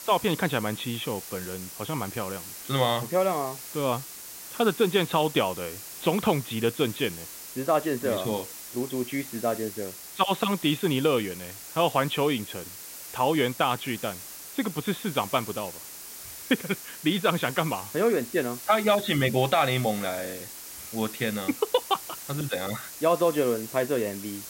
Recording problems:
high frequencies cut off; severe; nothing above 4 kHz
hiss; noticeable; throughout; 10 dB below the speech

